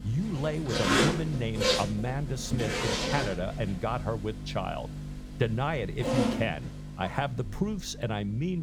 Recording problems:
household noises; very loud; throughout; 2 dB above the speech
electrical hum; noticeable; throughout; 50 Hz, 20 dB below the speech
abrupt cut into speech; at the end

